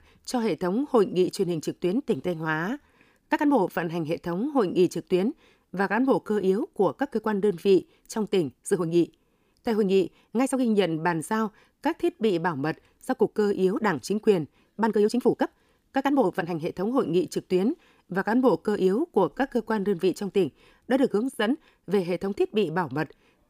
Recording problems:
uneven, jittery; strongly; from 2 to 22 s

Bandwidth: 15 kHz